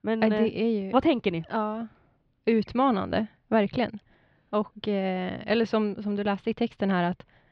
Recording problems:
muffled; slightly; fading above 3.5 kHz

